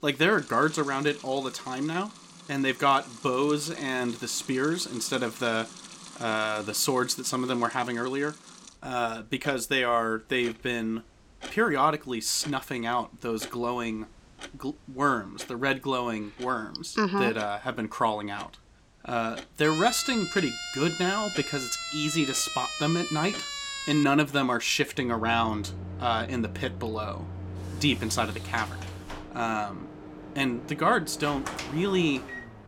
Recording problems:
household noises; noticeable; throughout; 15 dB below the speech
siren; noticeable; from 20 to 24 s; peak 4 dB below the speech
door banging; noticeable; from 28 s on; peak 8 dB below the speech

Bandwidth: 16.5 kHz